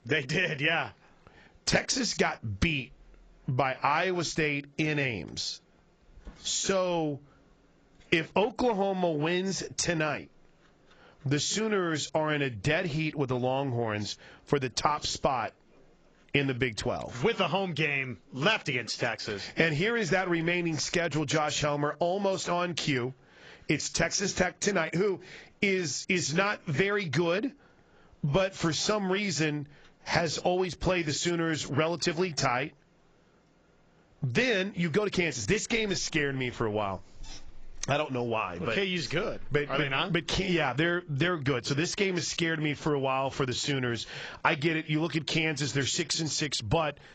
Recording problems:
garbled, watery; badly; nothing above 7.5 kHz
squashed, flat; heavily

